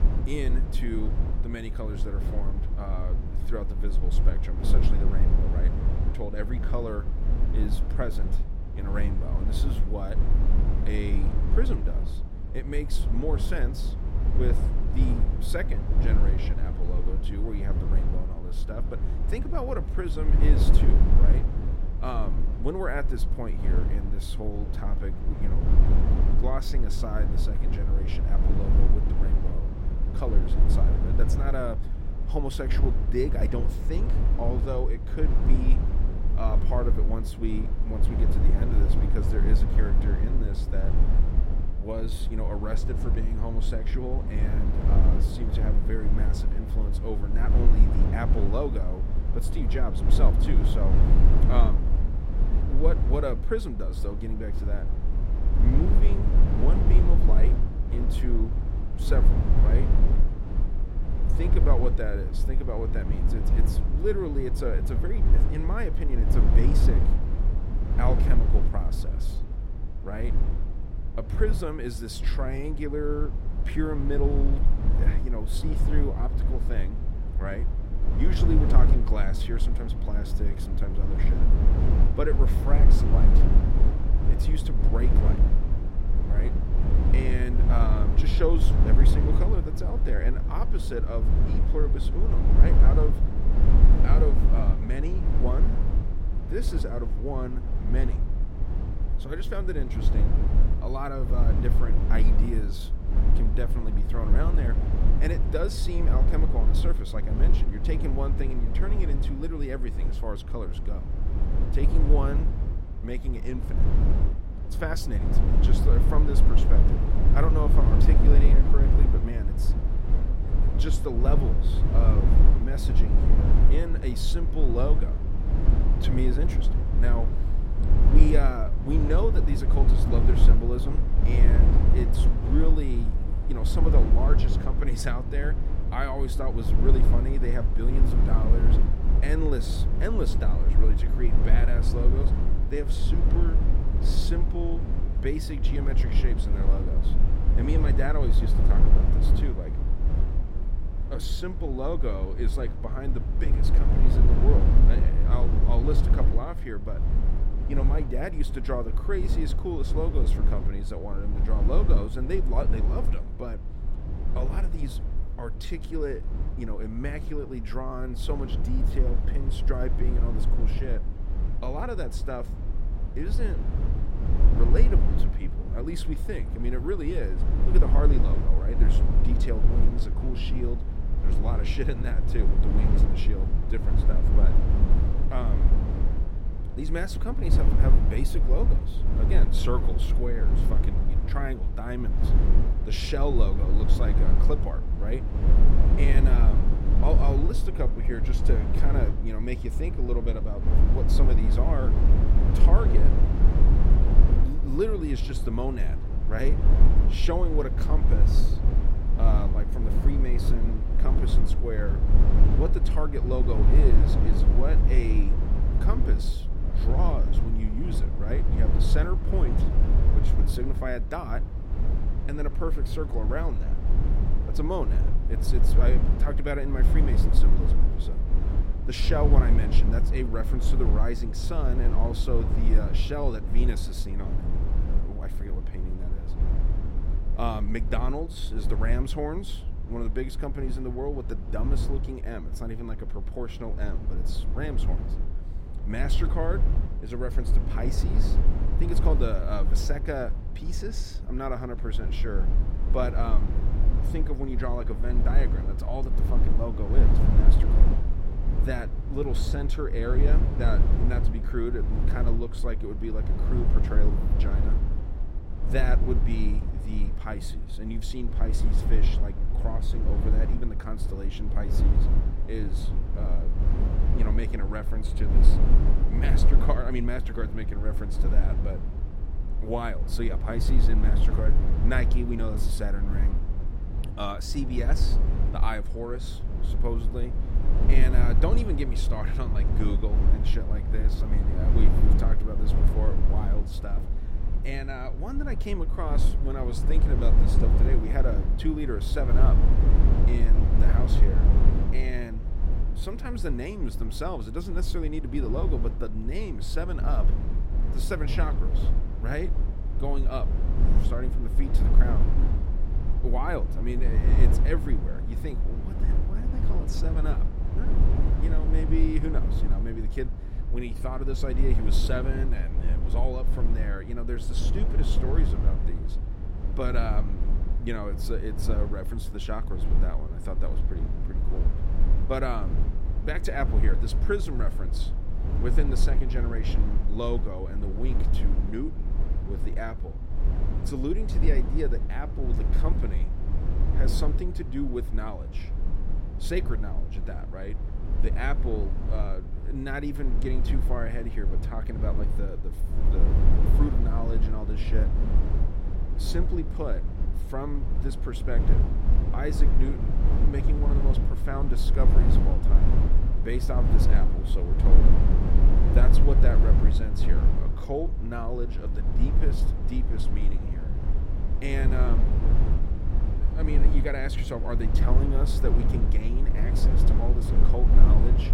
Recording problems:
low rumble; loud; throughout; 4 dB below the speech

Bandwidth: 16 kHz